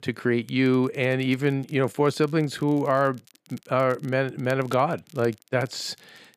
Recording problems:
crackle, like an old record; faint; 30 dB below the speech

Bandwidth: 14.5 kHz